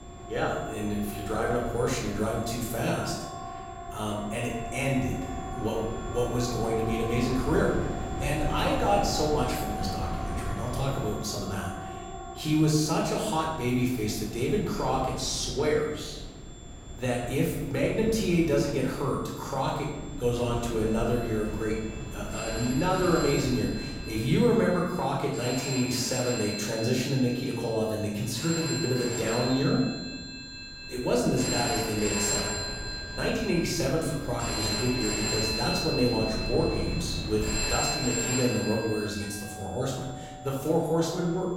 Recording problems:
off-mic speech; far
room echo; noticeable; dies away in 1 s
alarms or sirens; loud; throughout; 6 dB below the speech
wind noise on the microphone; occasional gusts; 15 dB below the speech
high-pitched whine; faint; throughout; 7.5 kHz, 25 dB below the speech

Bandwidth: 16.5 kHz